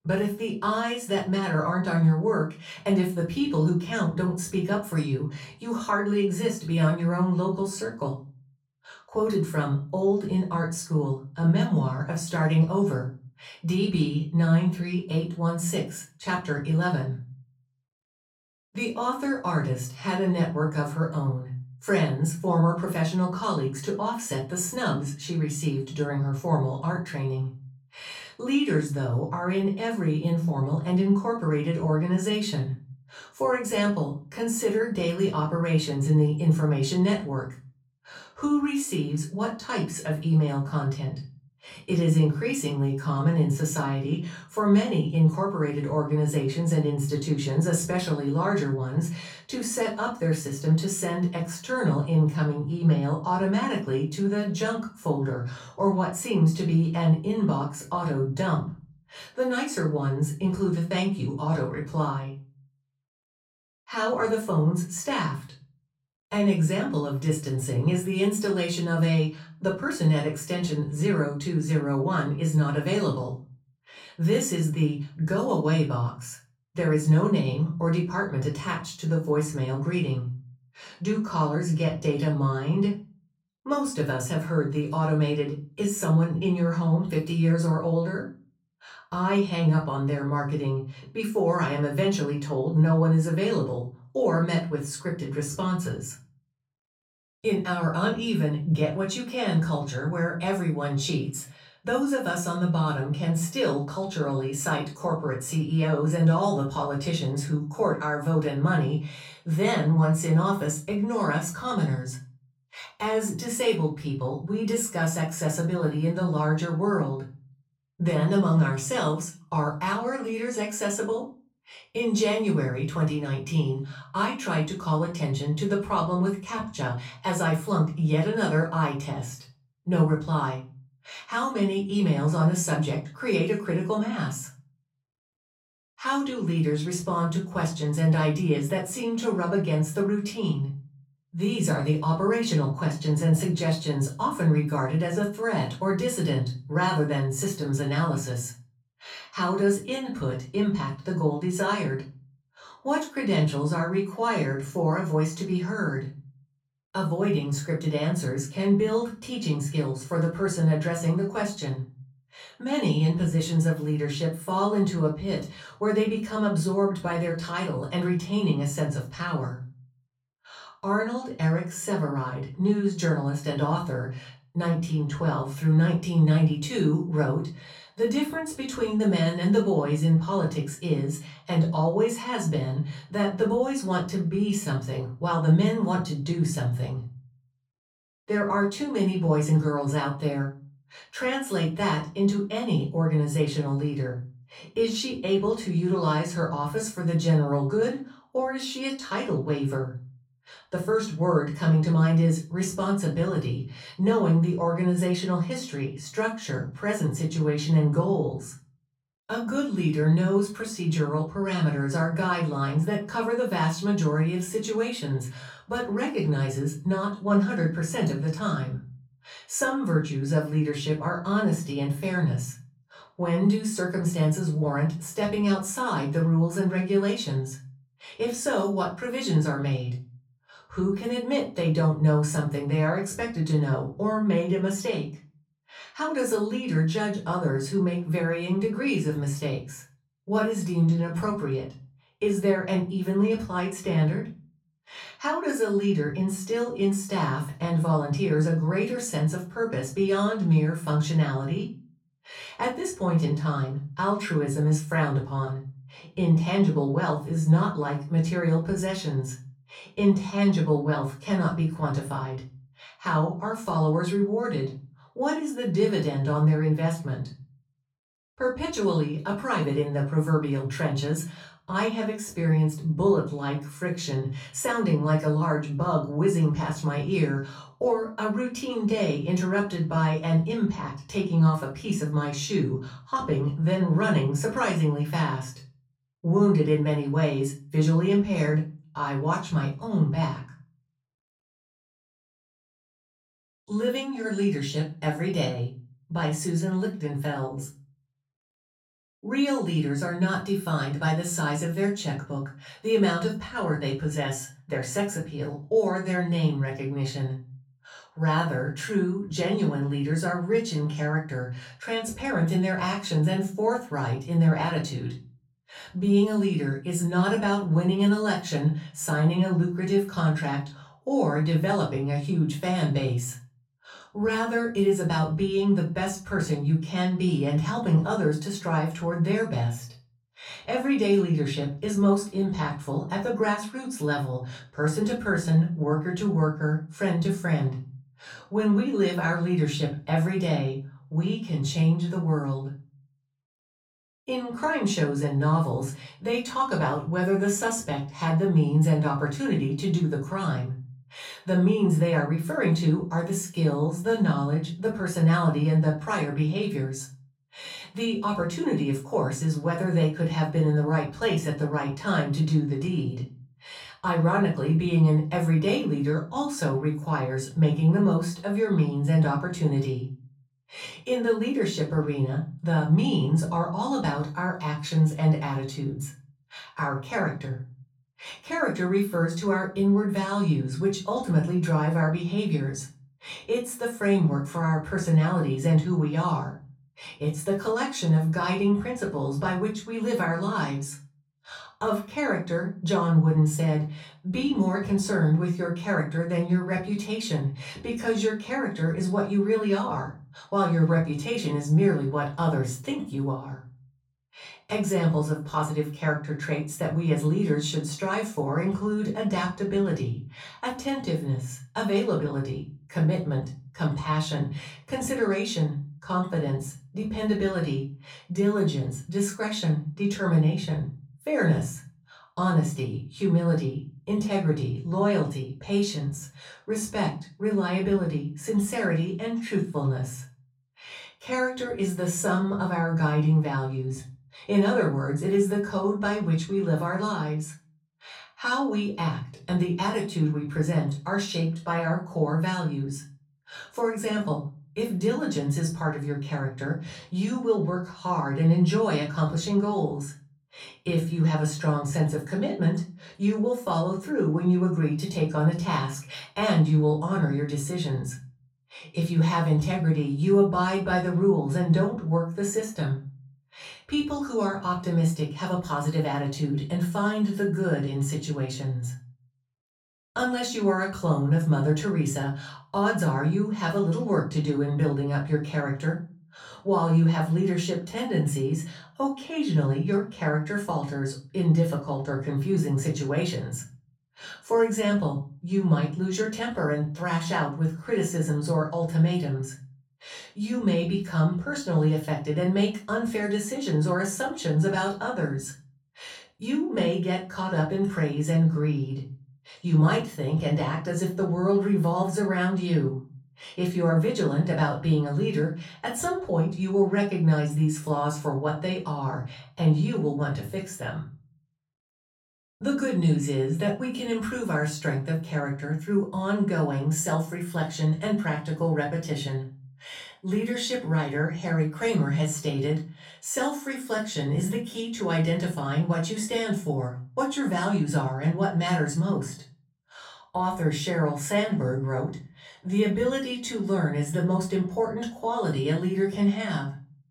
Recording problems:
off-mic speech; far
room echo; slight; dies away in 0.3 s

